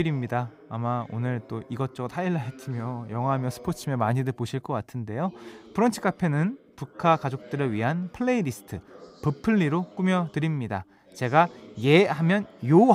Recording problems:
voice in the background; faint; throughout; 20 dB below the speech
abrupt cut into speech; at the start and the end

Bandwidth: 15.5 kHz